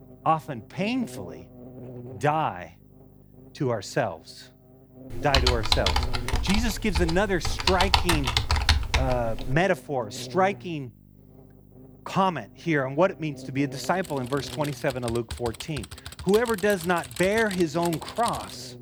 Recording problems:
electrical hum; faint; throughout; 50 Hz, 20 dB below the speech
keyboard typing; loud; from 5 to 9.5 s; peak 5 dB above the speech
keyboard typing; noticeable; from 14 s on; peak 8 dB below the speech

